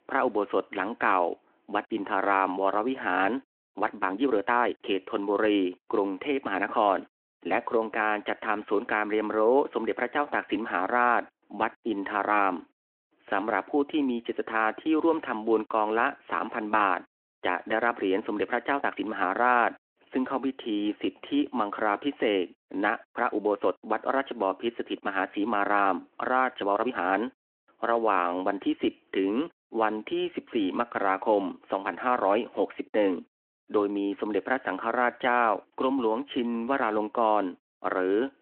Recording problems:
phone-call audio
uneven, jittery; strongly; from 1.5 to 28 s

